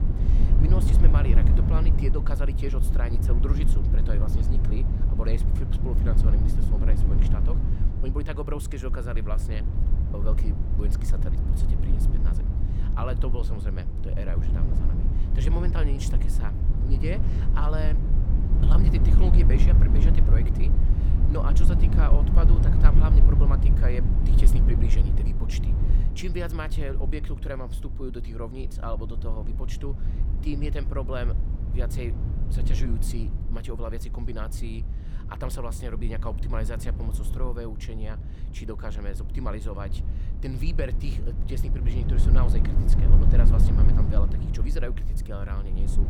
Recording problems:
low rumble; loud; throughout; 2 dB below the speech

